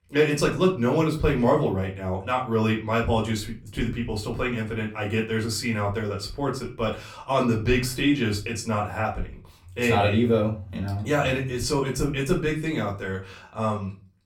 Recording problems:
off-mic speech; far
room echo; very slight; dies away in 0.3 s

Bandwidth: 17 kHz